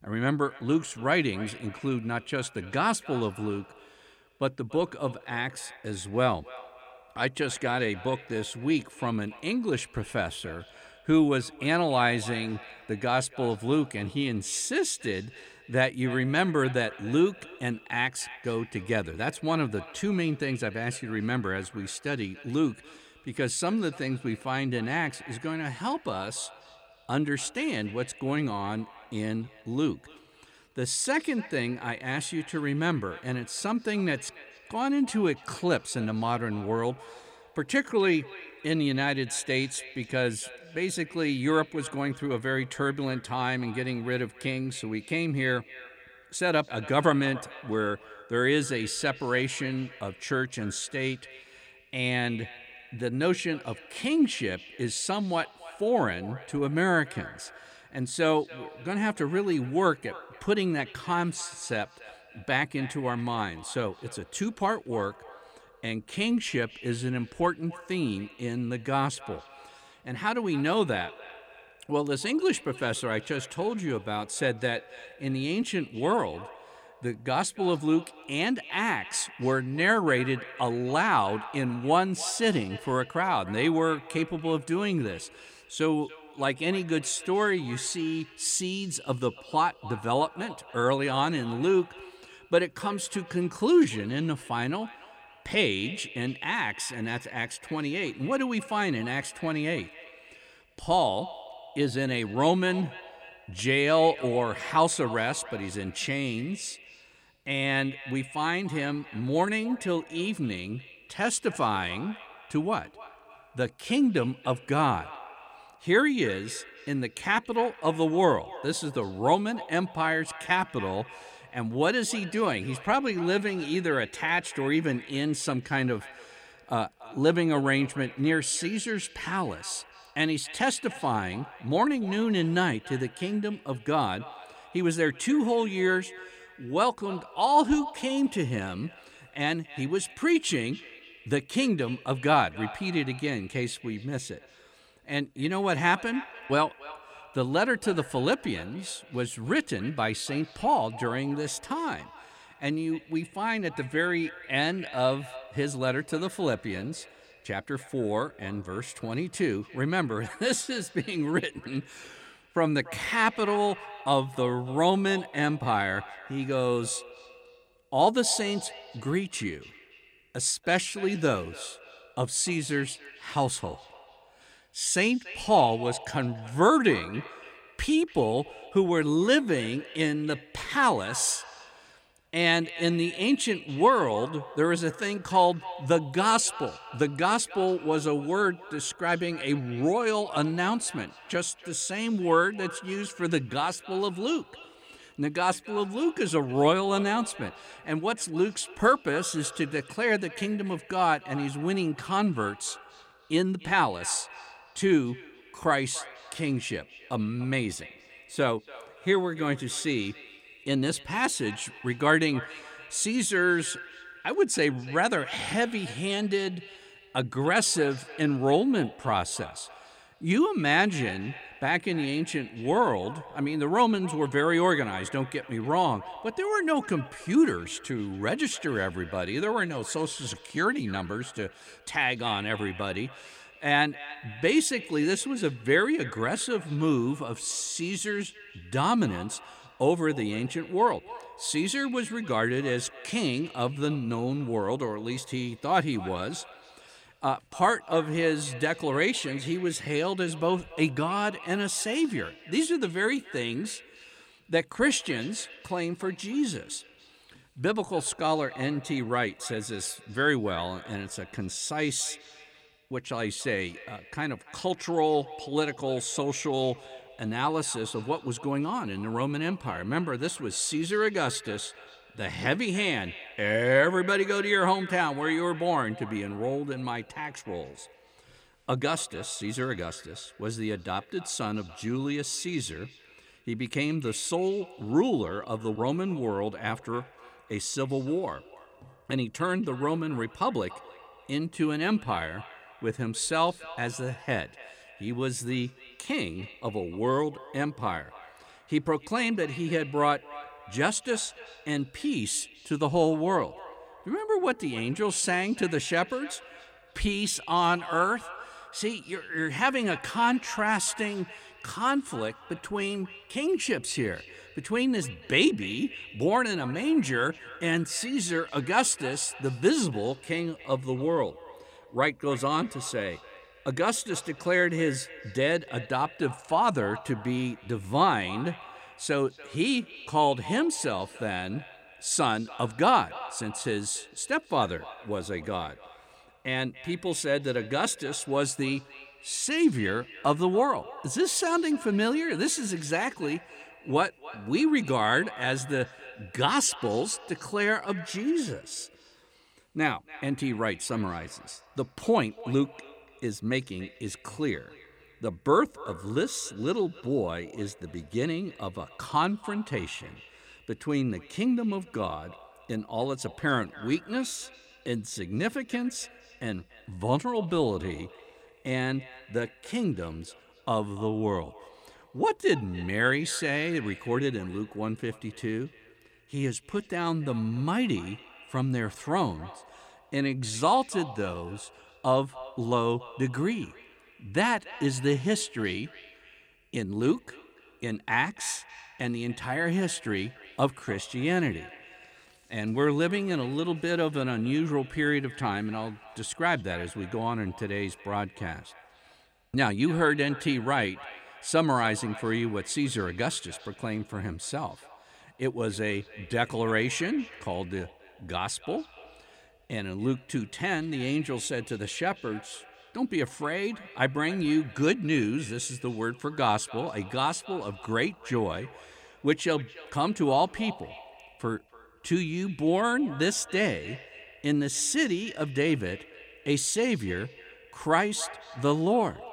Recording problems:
echo of what is said; noticeable; throughout; 290 ms later, 20 dB below the speech

